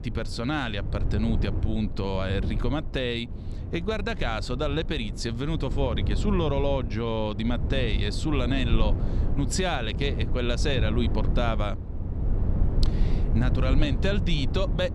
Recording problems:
low rumble; noticeable; throughout; 10 dB below the speech

